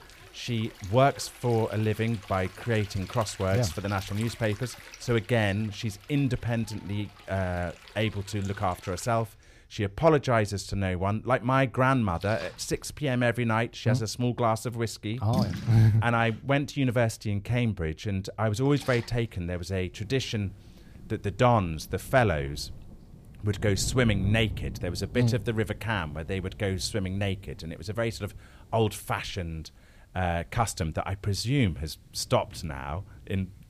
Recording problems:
rain or running water; noticeable; throughout; 15 dB below the speech

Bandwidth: 15 kHz